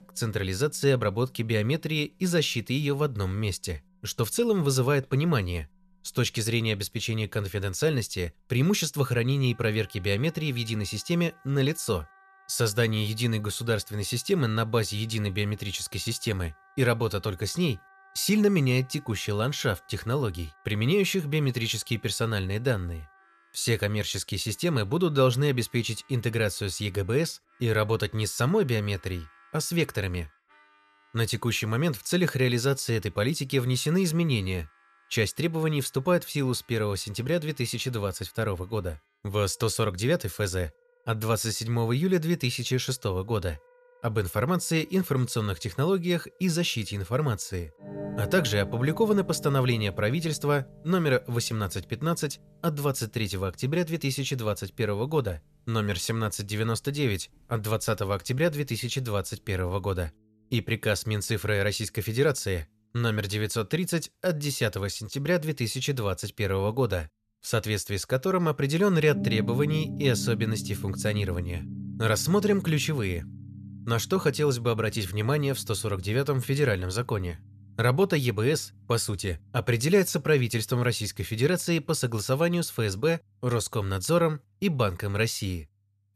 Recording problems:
background music; noticeable; throughout; 15 dB below the speech

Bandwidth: 14 kHz